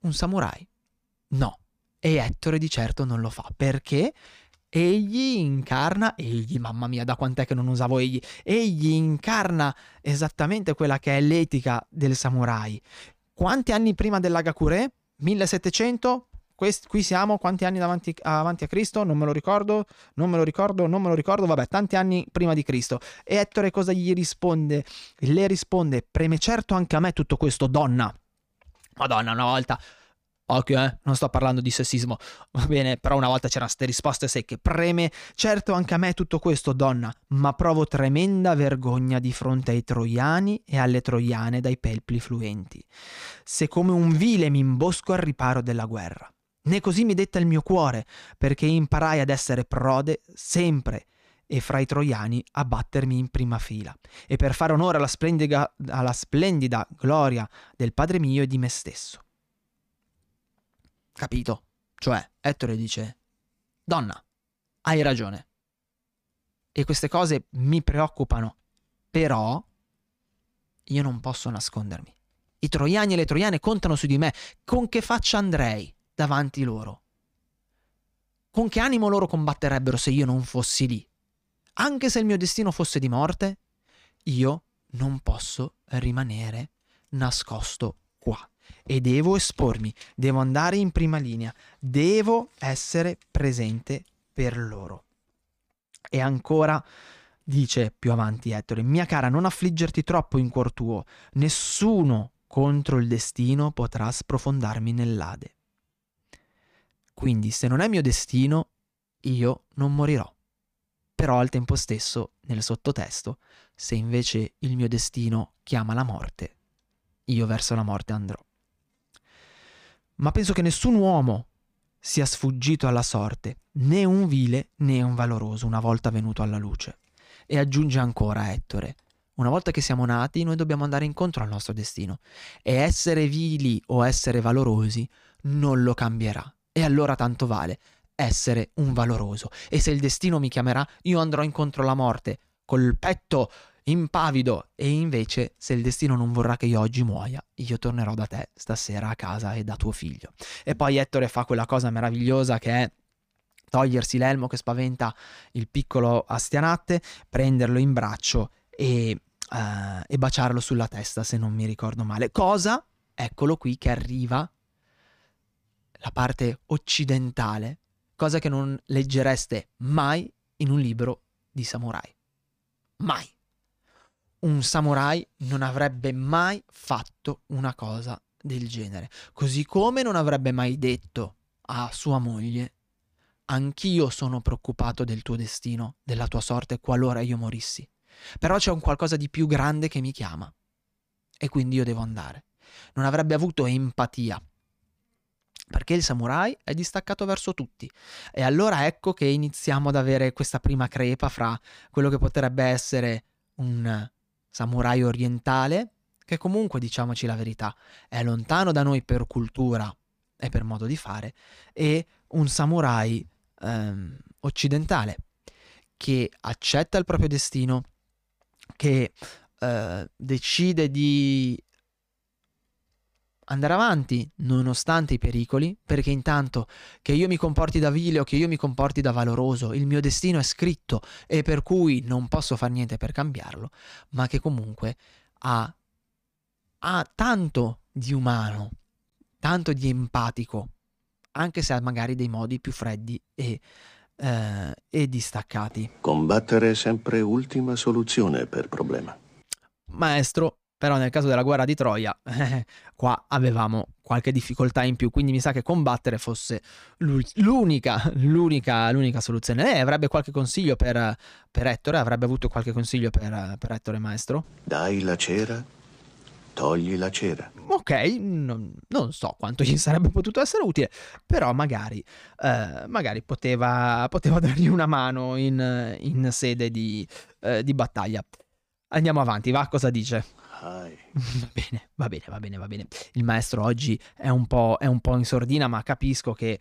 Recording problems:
none

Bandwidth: 15 kHz